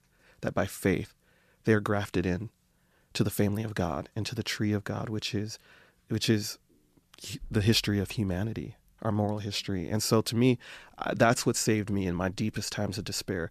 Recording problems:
none

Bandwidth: 14.5 kHz